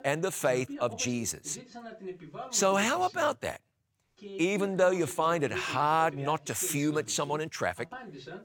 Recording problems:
voice in the background; noticeable; throughout; 15 dB below the speech

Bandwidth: 17 kHz